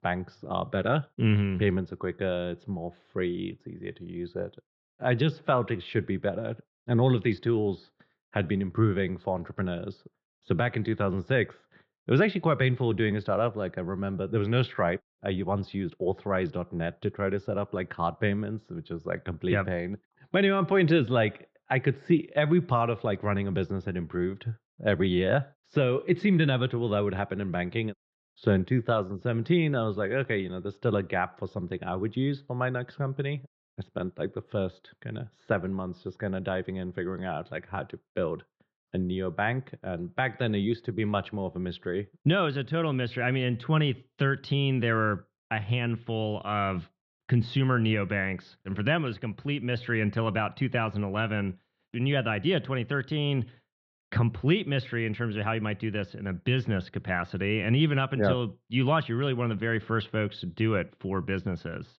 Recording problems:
muffled; slightly; fading above 4 kHz

